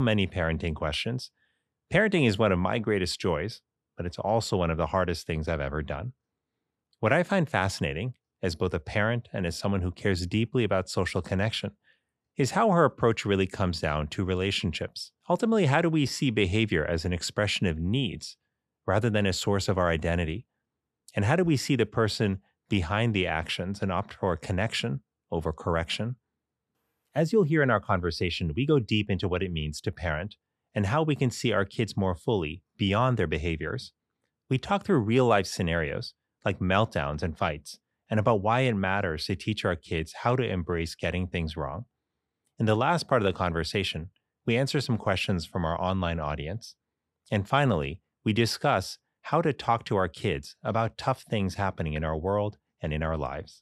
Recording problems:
abrupt cut into speech; at the start

